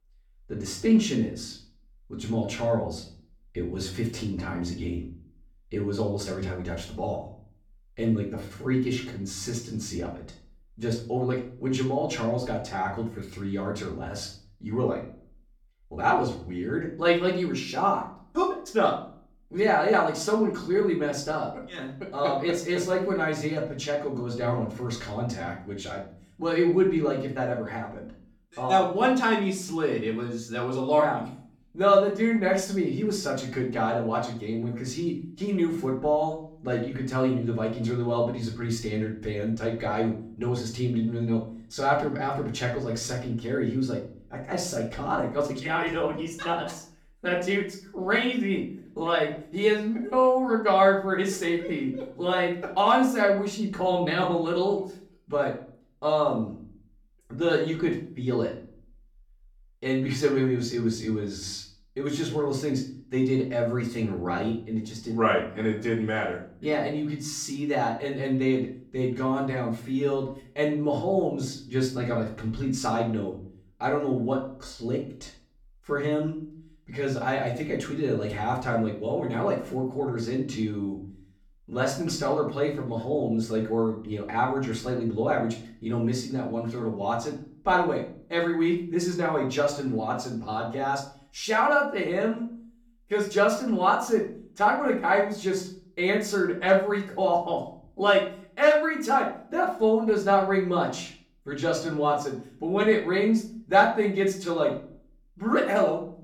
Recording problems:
off-mic speech; far
room echo; slight; dies away in 0.4 s

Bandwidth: 17.5 kHz